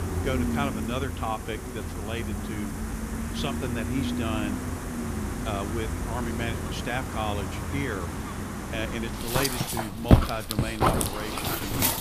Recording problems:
animal sounds; very loud; throughout; 4 dB above the speech

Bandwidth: 15 kHz